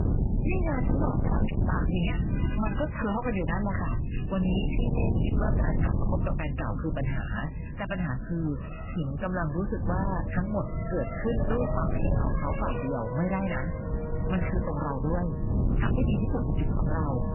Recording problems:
distortion; heavy; 18% of the sound clipped
garbled, watery; badly; nothing above 3 kHz
wind noise on the microphone; heavy; 5 dB below the speech
traffic noise; loud; throughout; 8 dB below the speech

